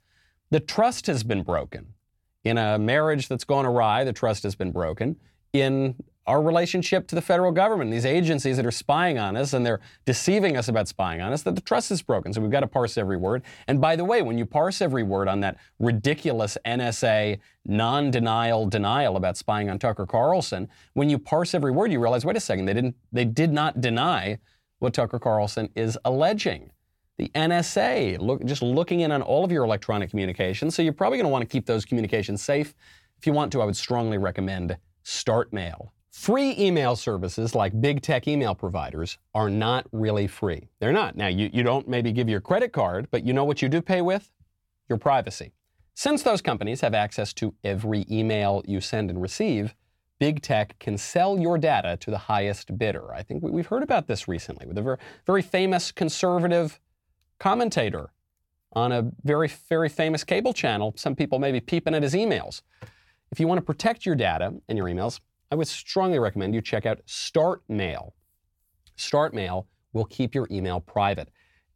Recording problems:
none

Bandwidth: 17.5 kHz